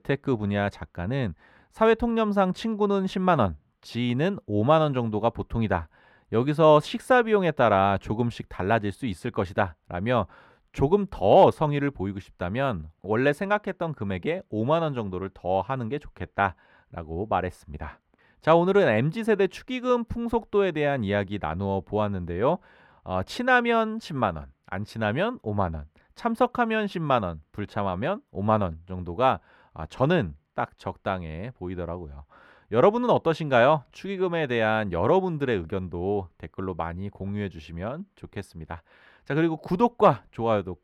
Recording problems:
muffled; slightly; fading above 3.5 kHz

